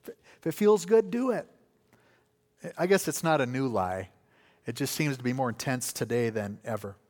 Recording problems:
none

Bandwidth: 18.5 kHz